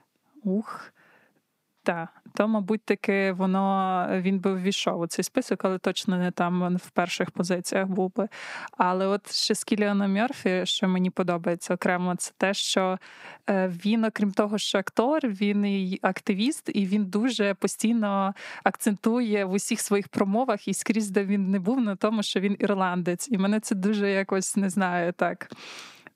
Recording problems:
squashed, flat; somewhat

